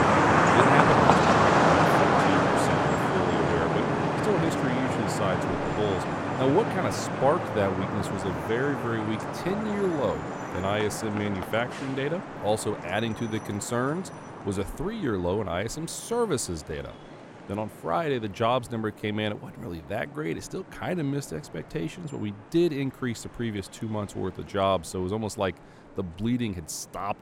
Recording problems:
traffic noise; very loud; throughout; 4 dB above the speech

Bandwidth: 16.5 kHz